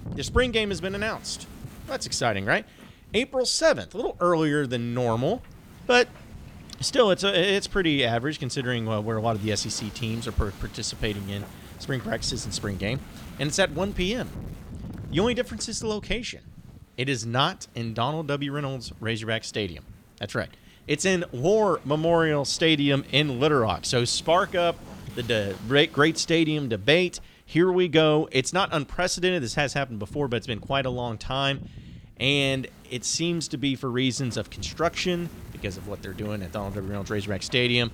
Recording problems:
wind noise on the microphone; occasional gusts; 25 dB below the speech

